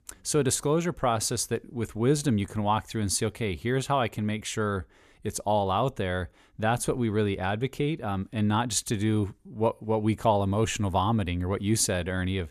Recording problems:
none

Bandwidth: 14.5 kHz